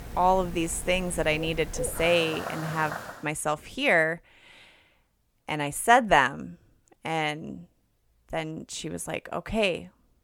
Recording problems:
animal sounds; noticeable; until 3 s; 10 dB below the speech

